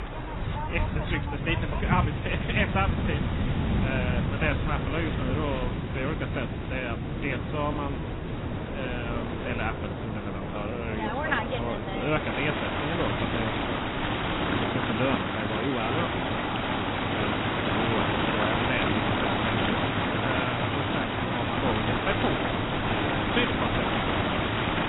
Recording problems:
garbled, watery; badly; nothing above 4 kHz
rain or running water; very loud; throughout; 4 dB above the speech
wind noise on the microphone; occasional gusts; 10 dB below the speech

